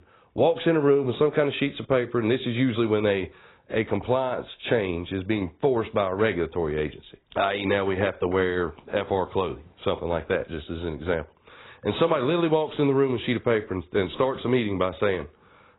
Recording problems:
garbled, watery; badly; nothing above 4 kHz

